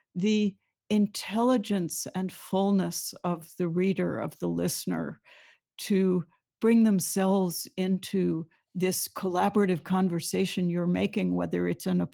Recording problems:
garbled, watery; slightly; nothing above 18 kHz

